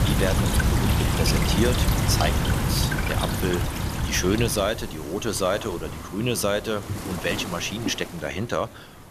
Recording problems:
rain or running water; very loud; throughout; 2 dB above the speech

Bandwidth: 14.5 kHz